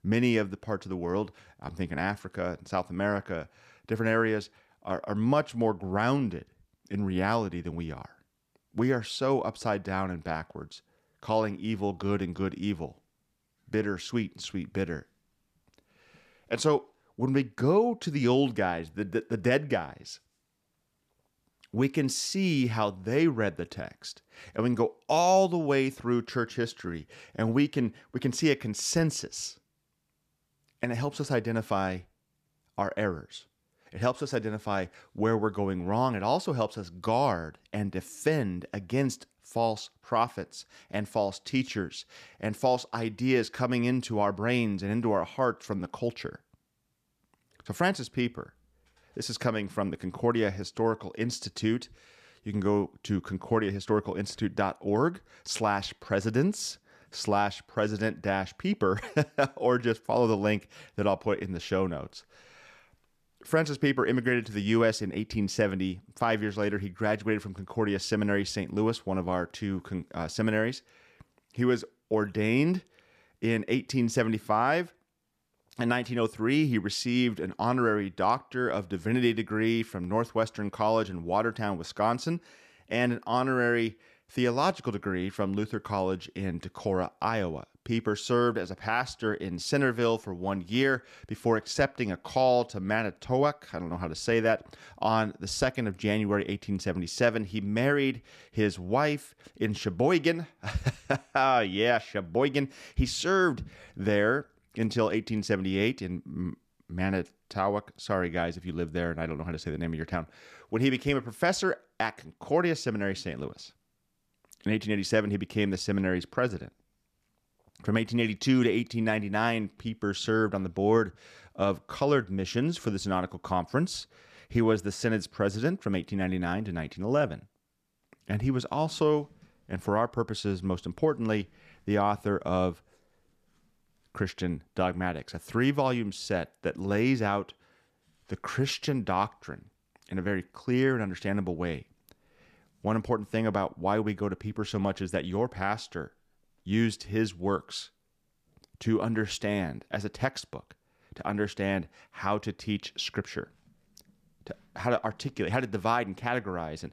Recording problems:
none

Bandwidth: 14.5 kHz